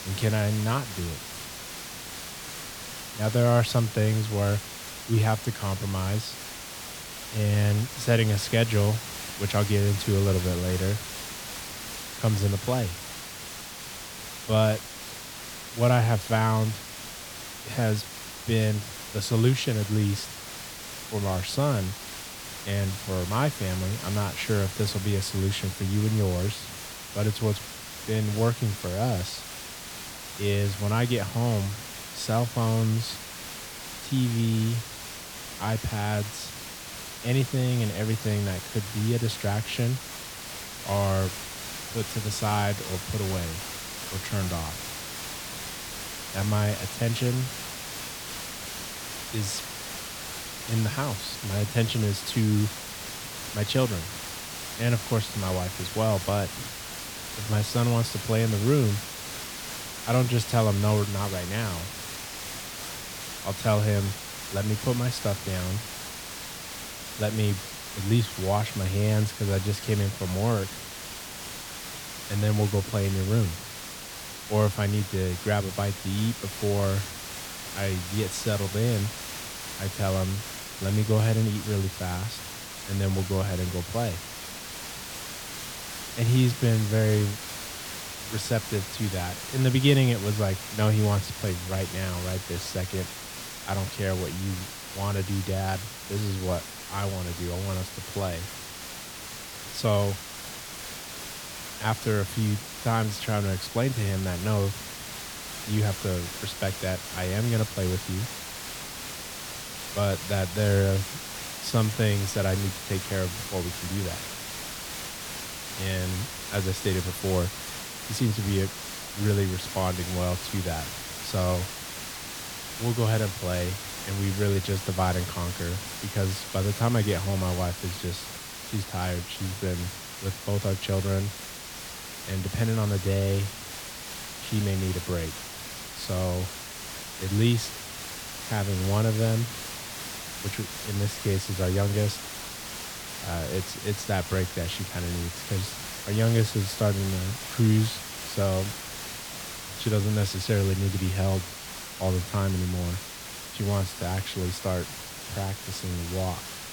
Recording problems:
hiss; loud; throughout; 8 dB below the speech

